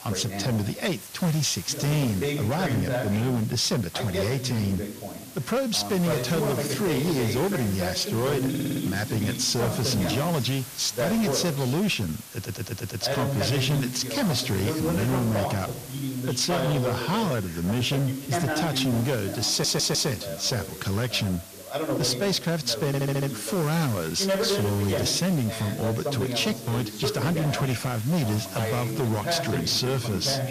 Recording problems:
distortion; slight; 16% of the sound clipped
voice in the background; loud; throughout; 5 dB below the speech
hiss; noticeable; throughout; 15 dB below the speech
audio stuttering; 4 times, first at 8.5 s

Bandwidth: 14.5 kHz